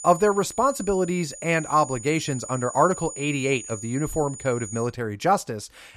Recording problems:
high-pitched whine; noticeable; until 5 s; 7 kHz, 10 dB below the speech

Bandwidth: 14 kHz